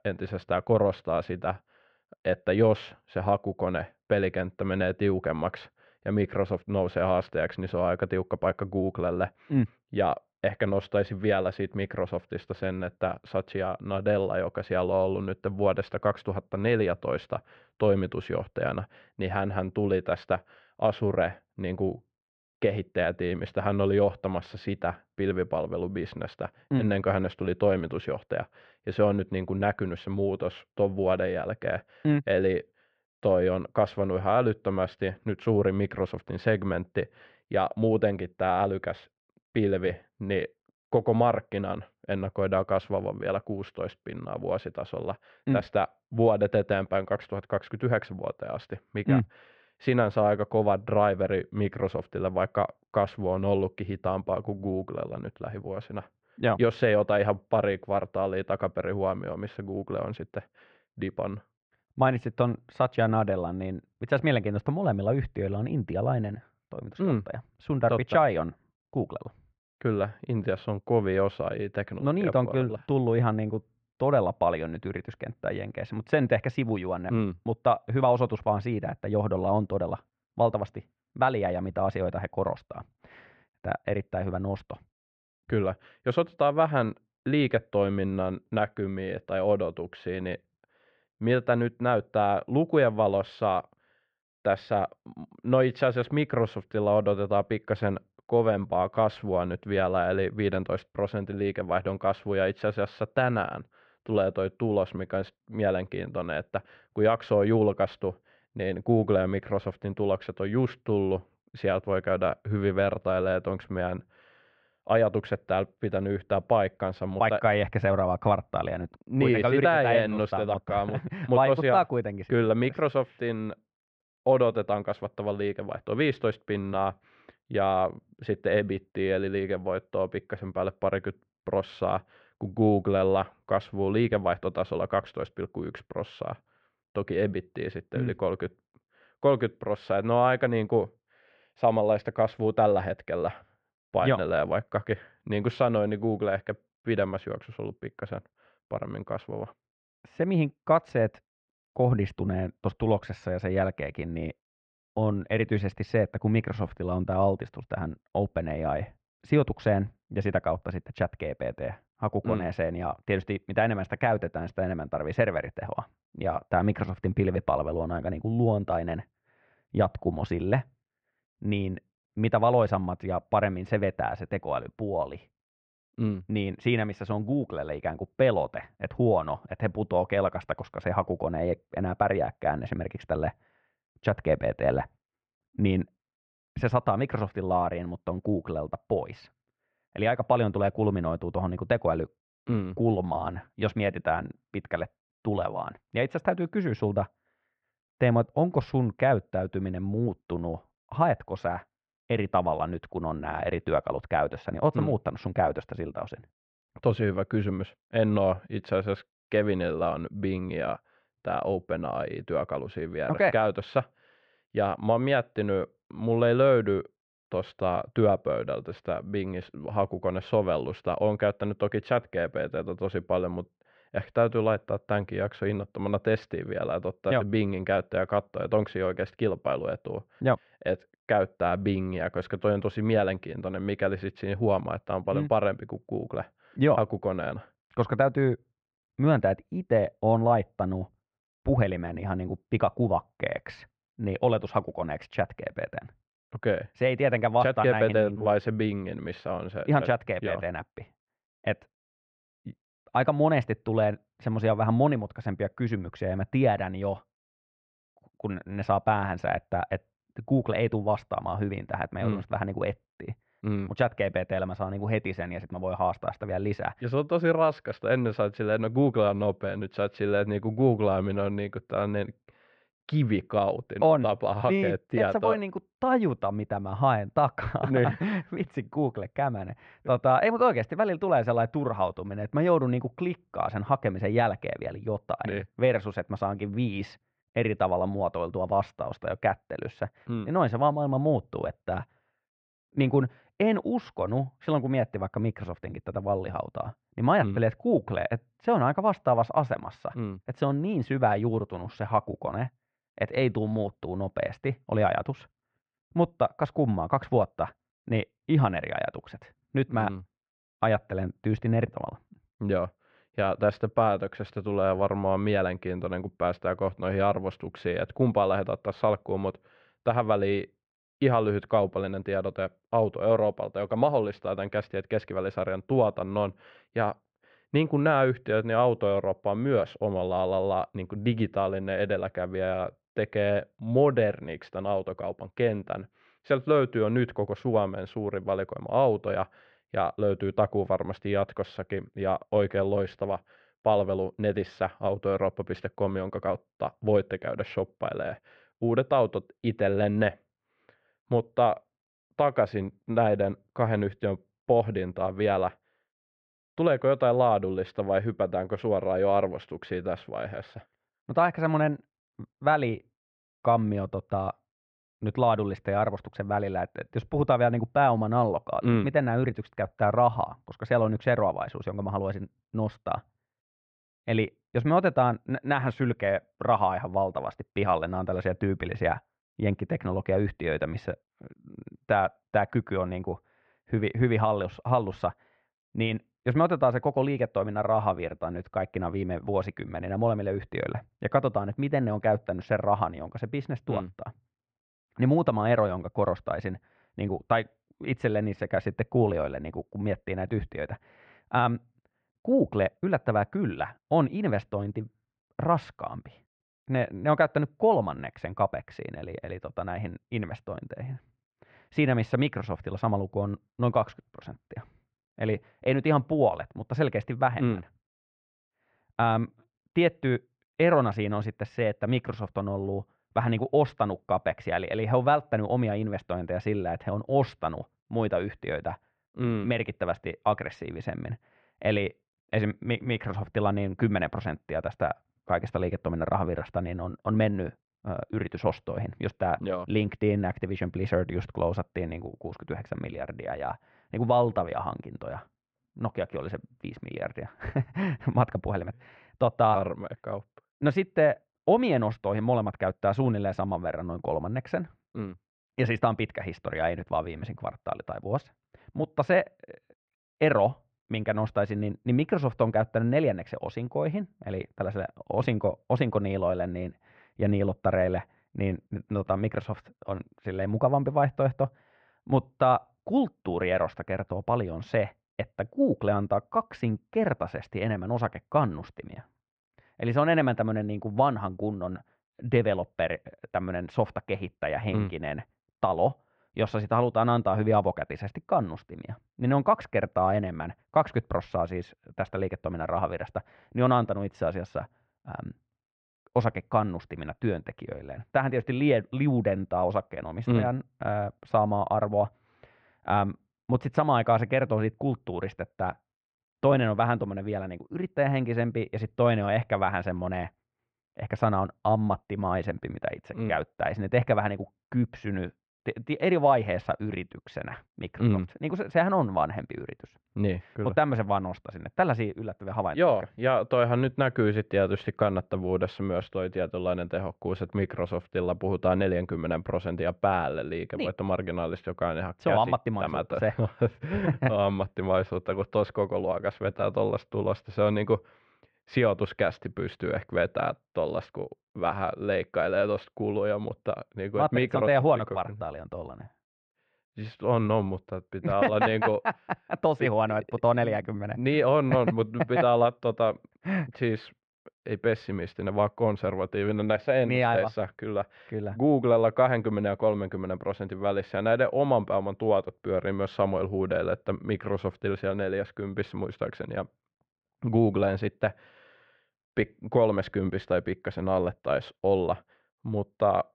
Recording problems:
muffled; very; fading above 2 kHz

